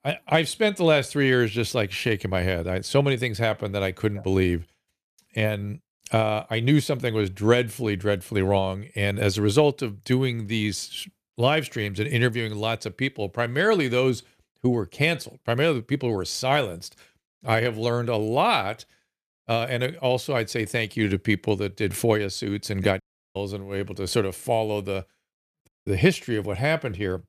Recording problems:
audio cutting out; at 23 s and at 26 s

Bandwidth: 14.5 kHz